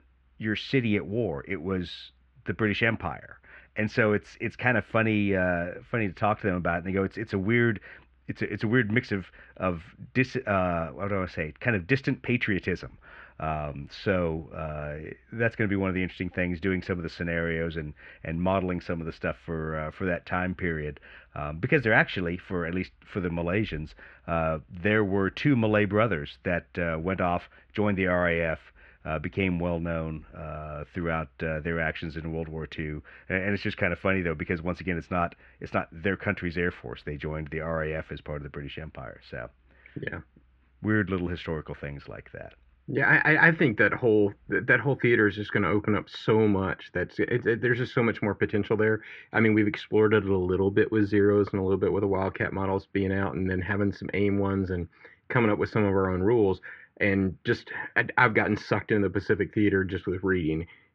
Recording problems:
muffled; very; fading above 2.5 kHz

